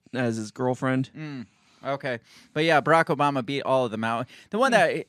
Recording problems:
none

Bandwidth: 14.5 kHz